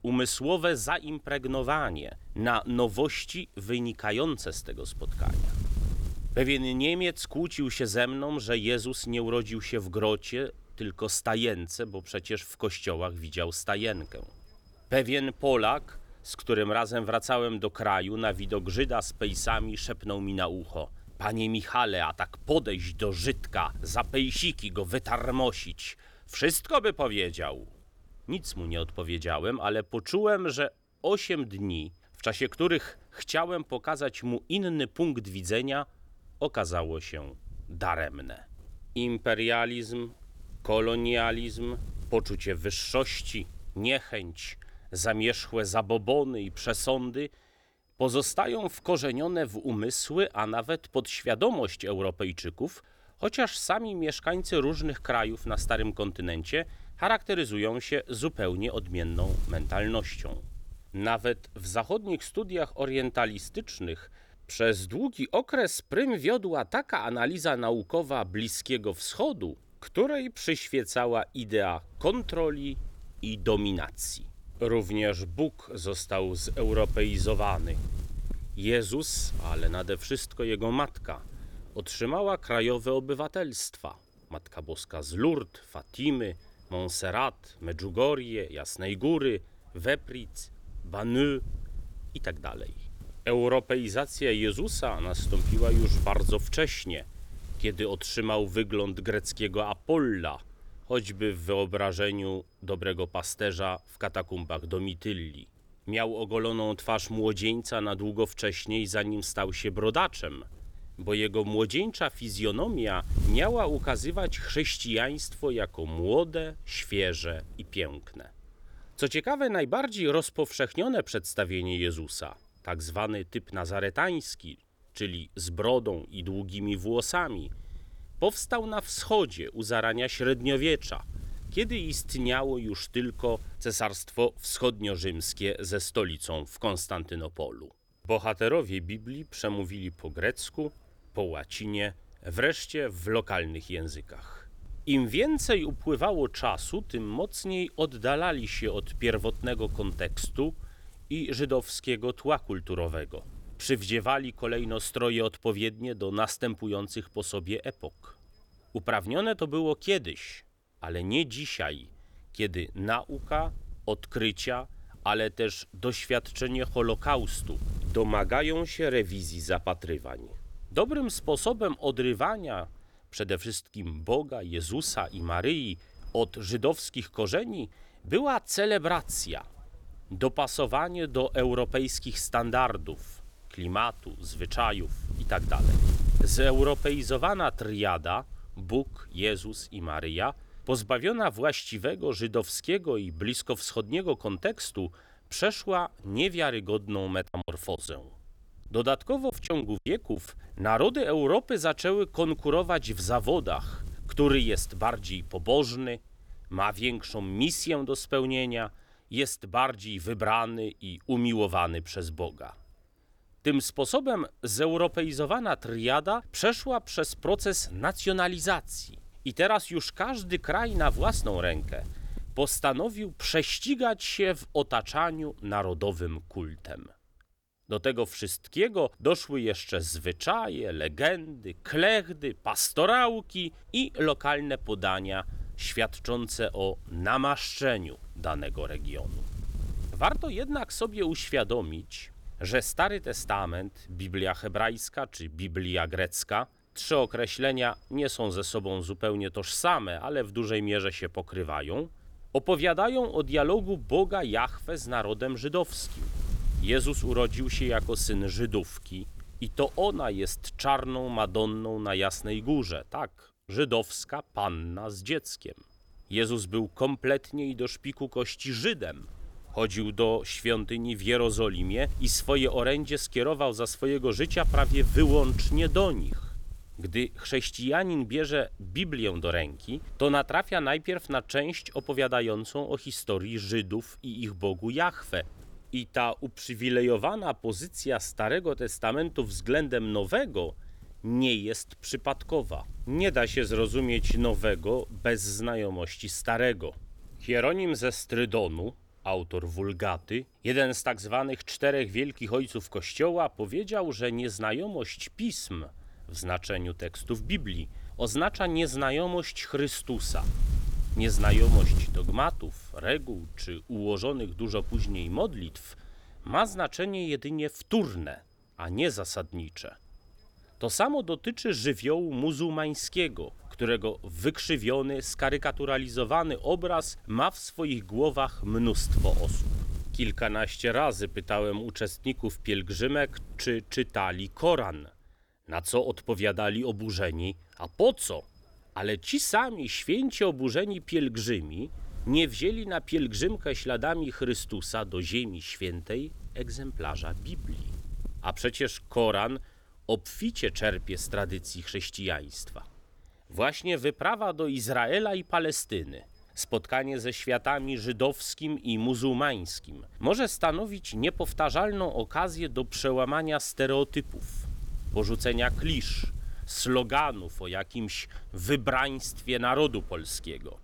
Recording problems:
wind noise on the microphone; occasional gusts; 25 dB below the speech
choppy; very; from 3:17 to 3:20; 10% of the speech affected

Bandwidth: 18.5 kHz